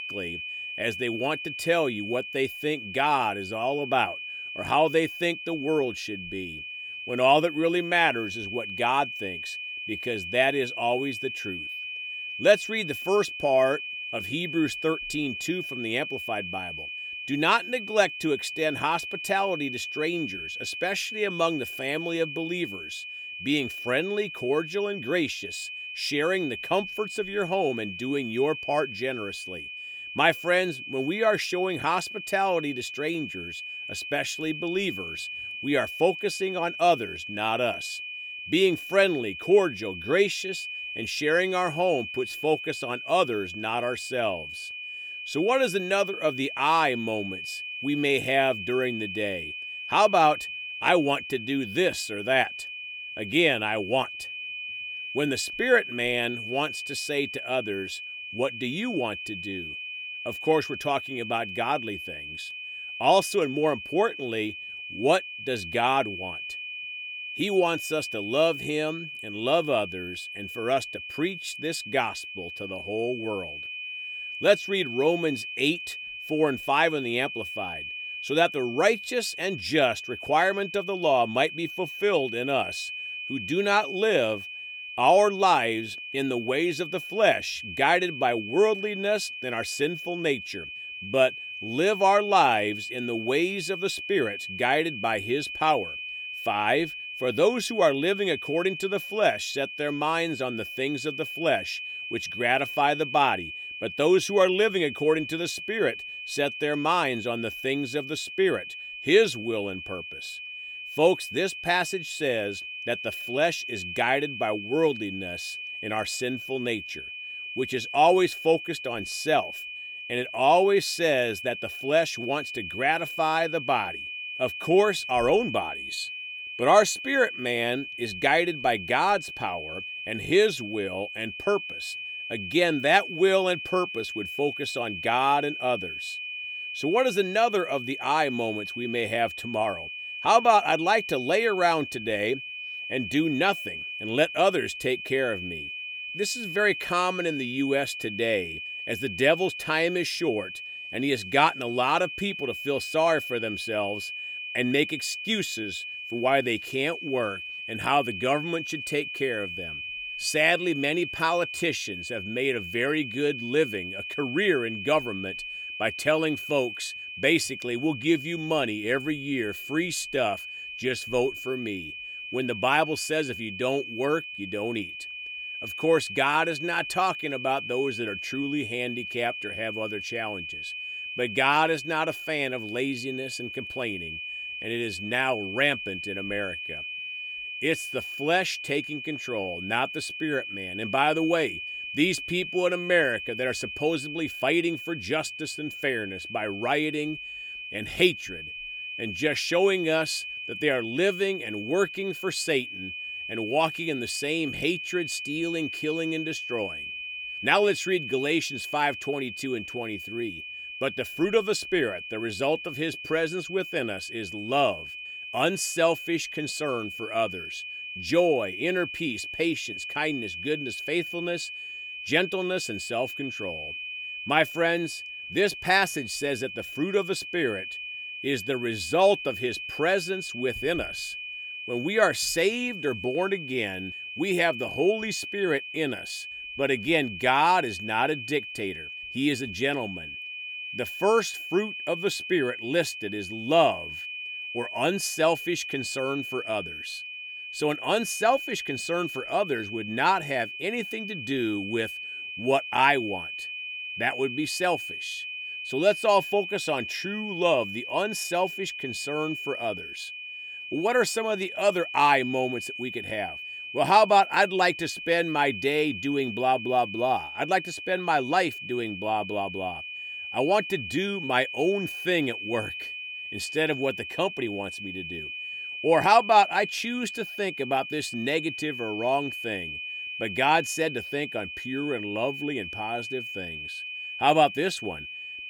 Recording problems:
high-pitched whine; loud; throughout; 2.5 kHz, 8 dB below the speech

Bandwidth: 18 kHz